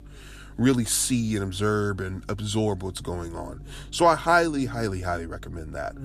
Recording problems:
electrical hum; faint; throughout; 50 Hz, 30 dB below the speech

